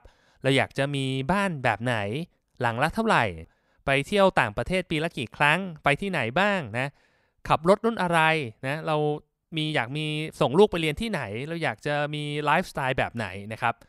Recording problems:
none

